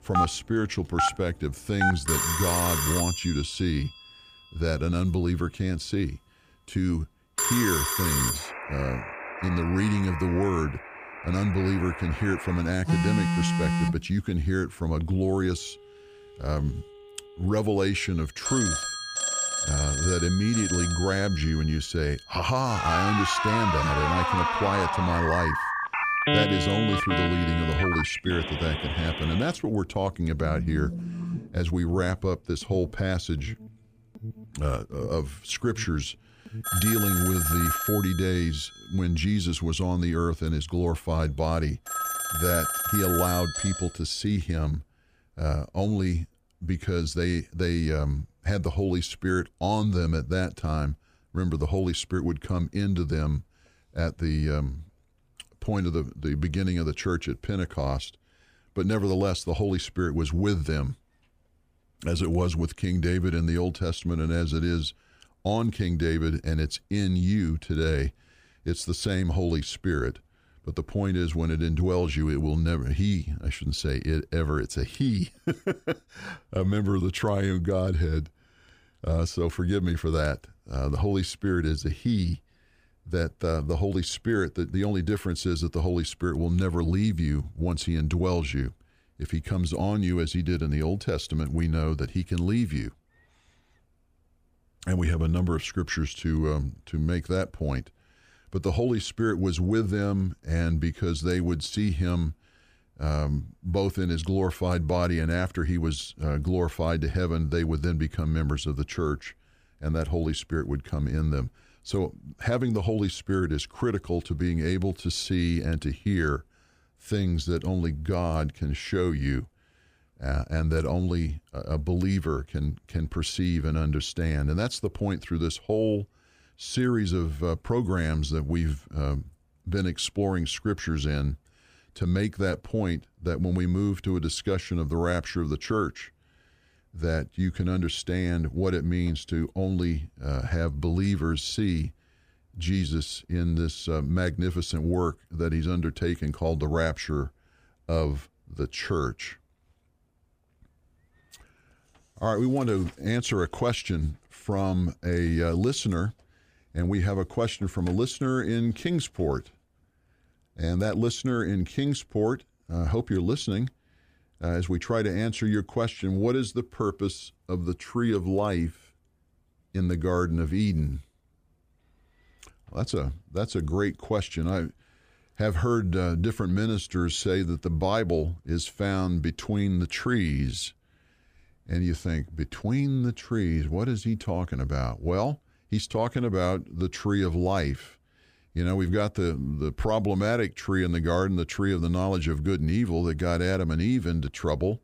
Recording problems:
alarms or sirens; loud; until 44 s; as loud as the speech

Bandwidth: 15 kHz